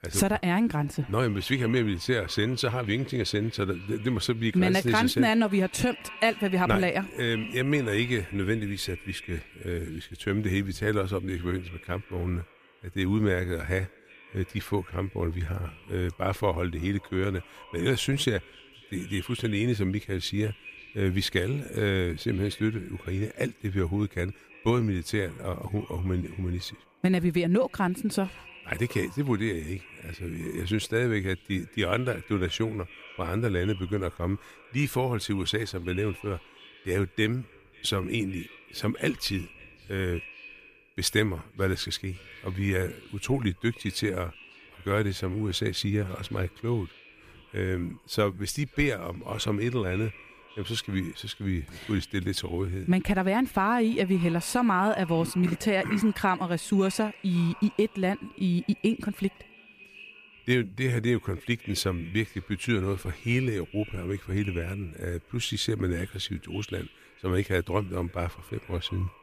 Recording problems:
echo of what is said; faint; throughout; 540 ms later, 20 dB below the speech

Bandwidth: 15 kHz